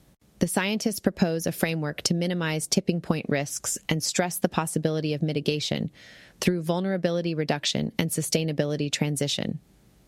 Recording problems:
squashed, flat; somewhat

